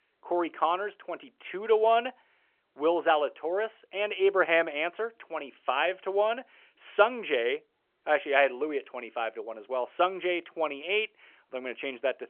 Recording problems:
phone-call audio; nothing above 3.5 kHz

